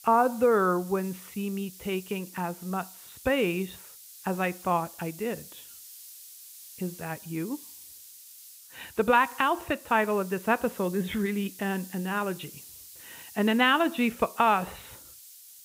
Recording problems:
high frequencies cut off; severe; nothing above 4 kHz
hiss; noticeable; throughout; 15 dB below the speech

